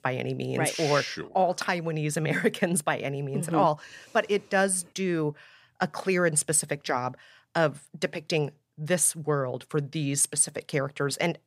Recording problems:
none

